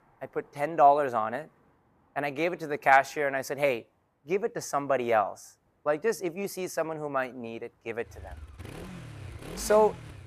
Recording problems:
traffic noise; noticeable; throughout; 15 dB below the speech

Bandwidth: 14.5 kHz